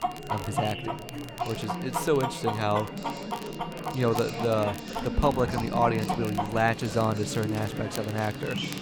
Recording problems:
animal sounds; loud; throughout; 8 dB below the speech
chatter from many people; loud; throughout; 7 dB below the speech
rain or running water; noticeable; from 4.5 s on; 20 dB below the speech
crackle, like an old record; noticeable; 20 dB below the speech
high-pitched whine; faint; throughout; 3 kHz, 20 dB below the speech

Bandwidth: 17 kHz